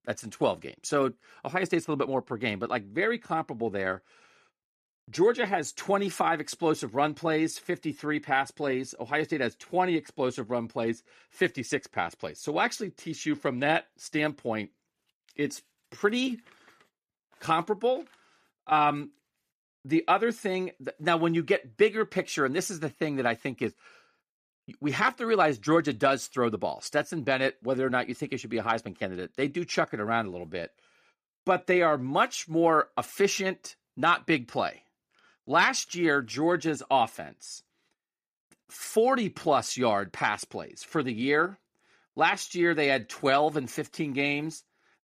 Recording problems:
none

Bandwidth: 14.5 kHz